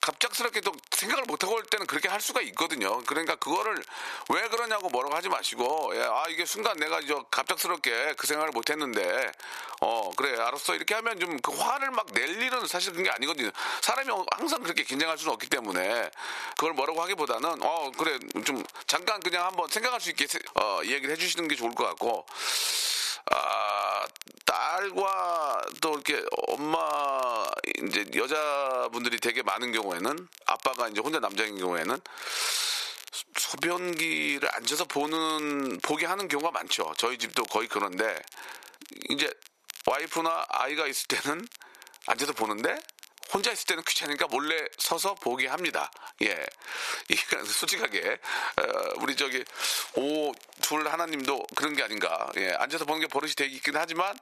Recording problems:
thin; somewhat; fading below 700 Hz
squashed, flat; somewhat
crackle, like an old record; noticeable; 20 dB below the speech

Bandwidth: 14 kHz